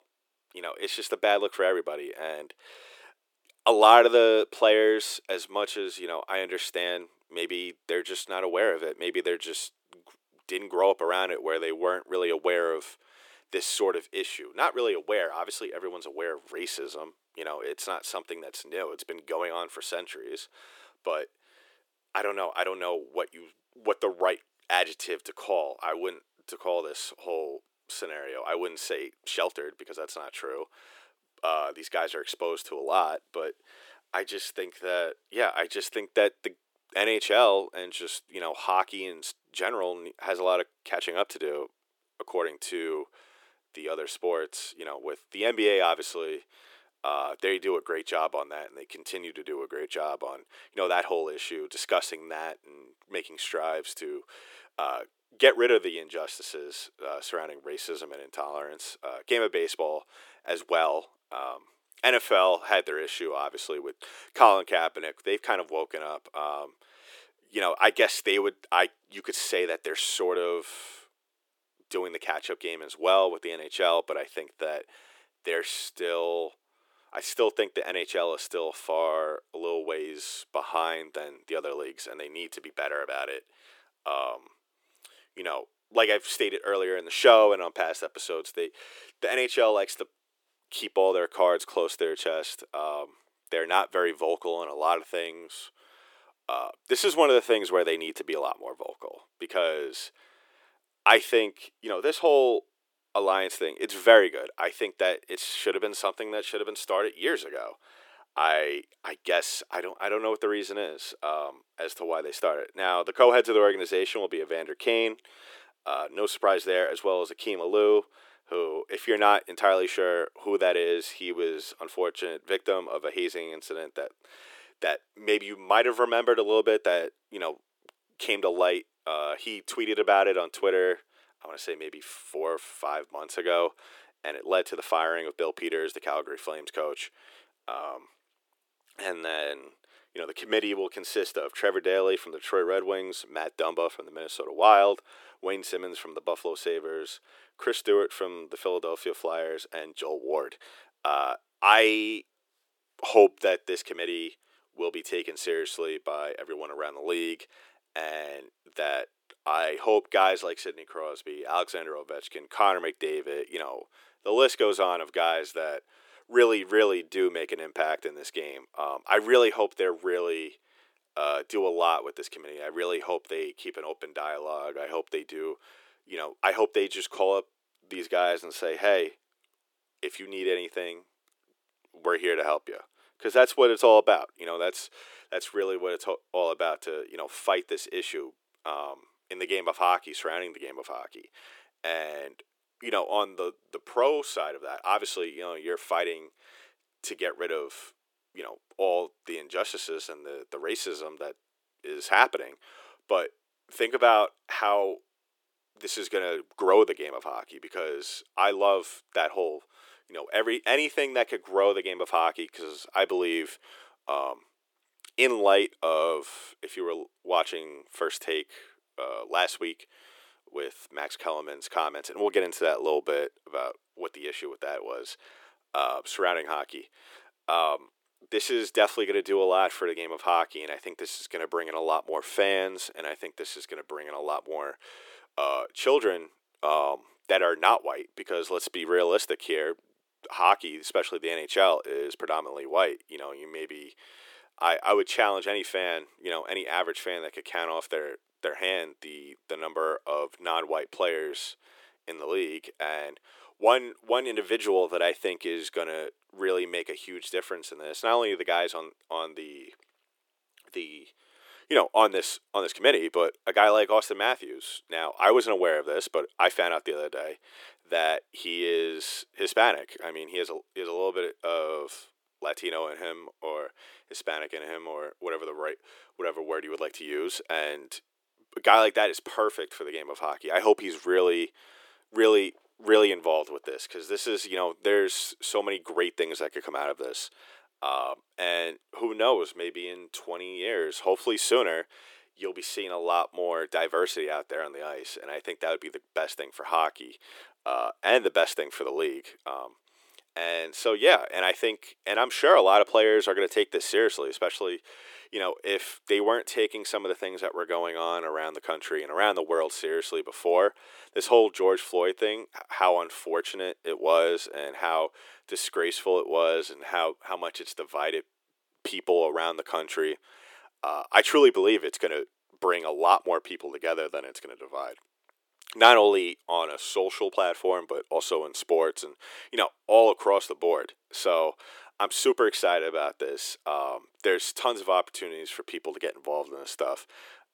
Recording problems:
thin; very; fading below 350 Hz

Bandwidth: 18 kHz